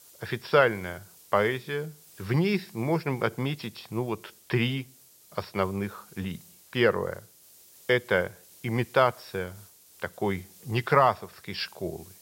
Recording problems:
high frequencies cut off; noticeable; nothing above 5.5 kHz
hiss; faint; throughout; 25 dB below the speech

